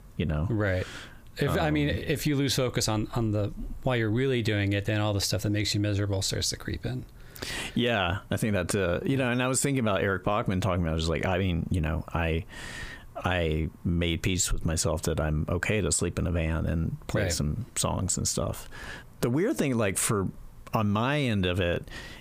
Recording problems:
squashed, flat; heavily

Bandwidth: 15 kHz